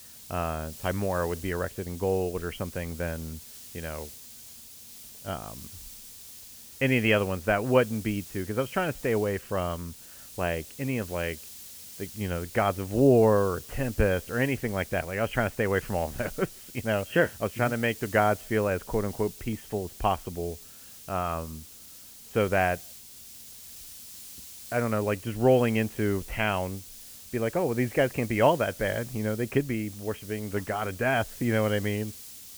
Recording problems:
high frequencies cut off; severe; nothing above 3.5 kHz
hiss; noticeable; throughout; 15 dB below the speech

